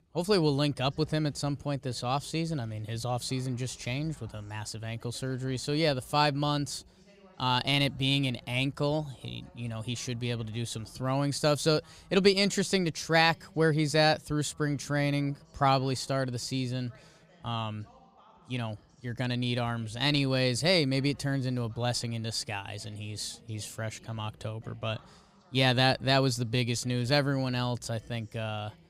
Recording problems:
voice in the background; faint; throughout; 30 dB below the speech

